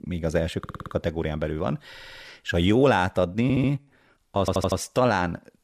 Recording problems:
audio stuttering; 4 times, first at 0.5 s

